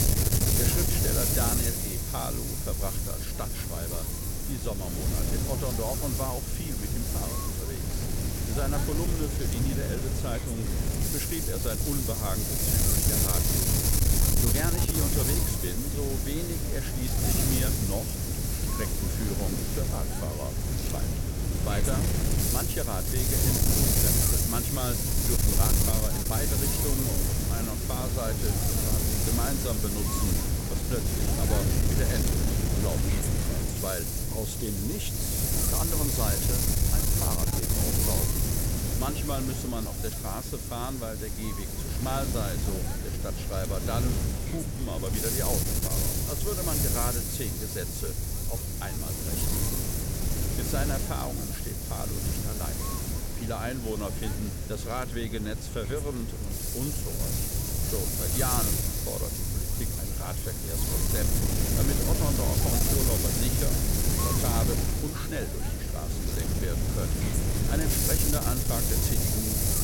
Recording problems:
wind noise on the microphone; heavy; 4 dB above the speech

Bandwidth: 17 kHz